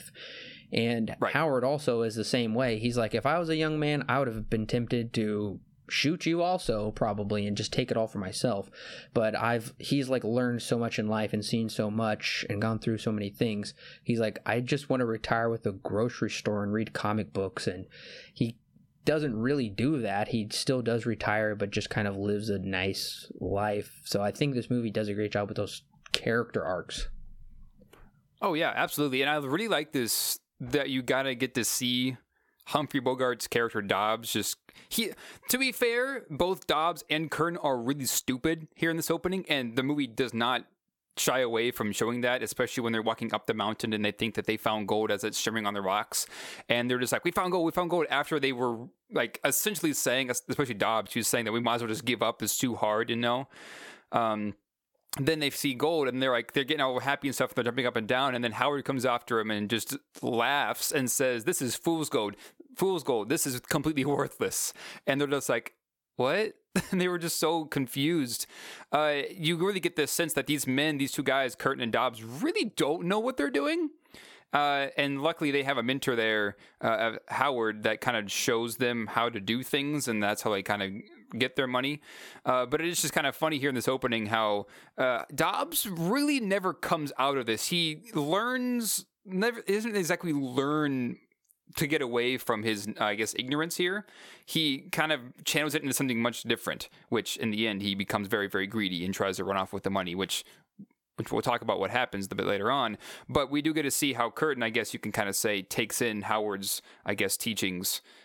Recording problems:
squashed, flat; somewhat

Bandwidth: 17.5 kHz